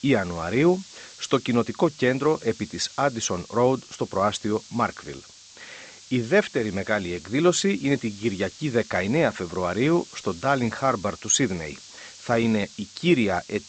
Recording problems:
high frequencies cut off; noticeable; nothing above 8 kHz
hiss; noticeable; throughout; 20 dB below the speech

